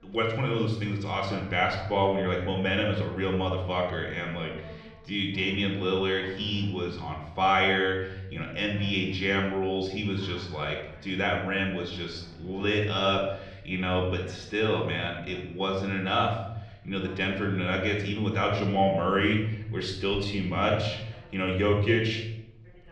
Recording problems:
room echo; noticeable; dies away in 0.7 s
muffled; slightly; fading above 4 kHz
off-mic speech; somewhat distant
voice in the background; faint; throughout; 25 dB below the speech

